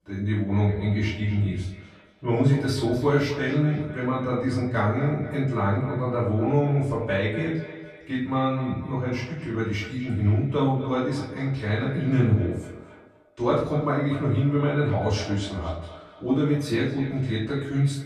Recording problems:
off-mic speech; far
echo of what is said; noticeable; throughout; 240 ms later, 15 dB below the speech
room echo; noticeable; dies away in 0.4 s

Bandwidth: 13.5 kHz